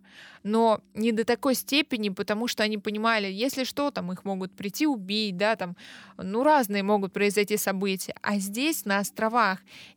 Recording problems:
none

